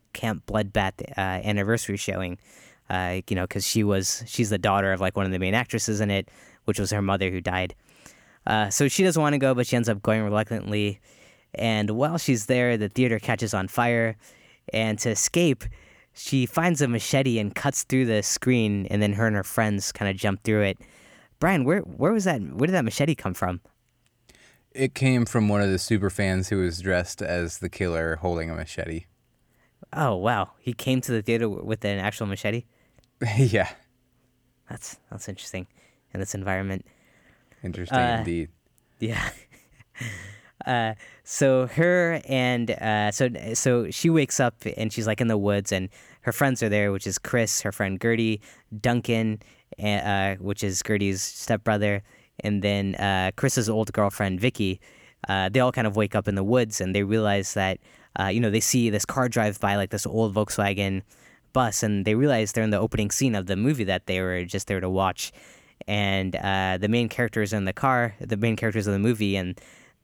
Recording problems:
none

